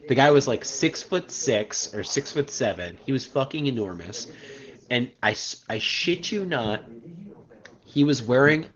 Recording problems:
garbled, watery; slightly; nothing above 6.5 kHz
background chatter; faint; throughout; 2 voices, 25 dB below the speech

